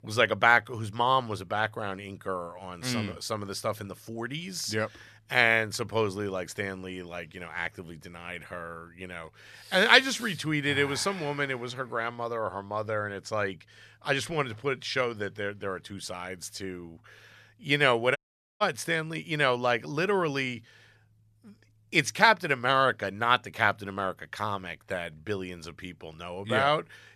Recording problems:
audio cutting out; at 18 s

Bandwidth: 14 kHz